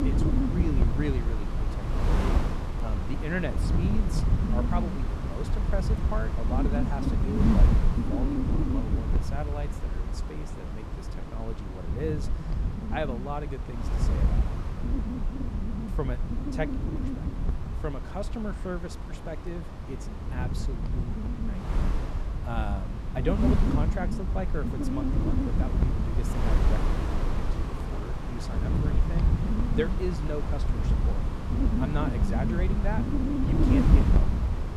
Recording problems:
wind noise on the microphone; heavy; 1 dB above the speech

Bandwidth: 14 kHz